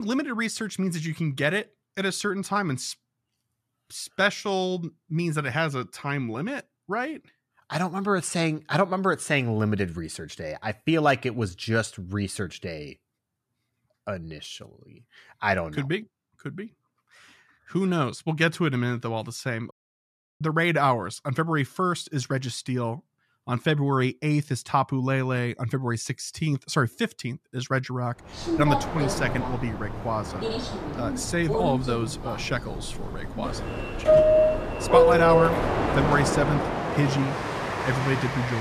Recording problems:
train or aircraft noise; very loud; from 28 s on; 2 dB above the speech
abrupt cut into speech; at the start and the end
audio cutting out; at 20 s for 0.5 s

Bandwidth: 14 kHz